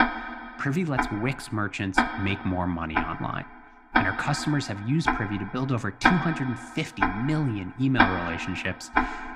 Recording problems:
household noises; very loud; throughout; 1 dB above the speech

